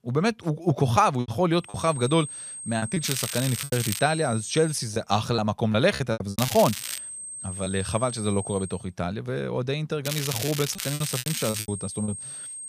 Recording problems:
high-pitched whine; loud; from 1.5 to 5 s, from 7 to 8.5 s and from 11 s on; 8.5 kHz, 9 dB below the speech
crackling; loud; at 3 s, at 6.5 s and from 10 to 12 s; 6 dB below the speech
choppy; very; 8% of the speech affected

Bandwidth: 15 kHz